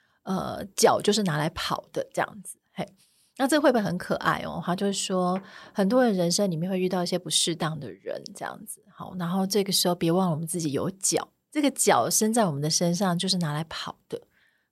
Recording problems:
none

